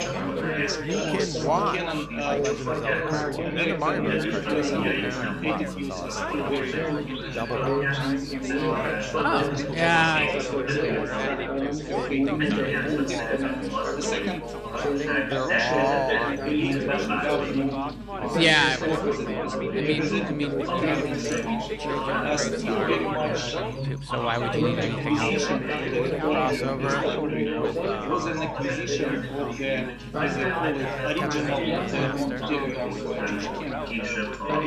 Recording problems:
chatter from many people; very loud; throughout; 3 dB above the speech
electrical hum; noticeable; throughout; 50 Hz, 15 dB below the speech

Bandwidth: 14.5 kHz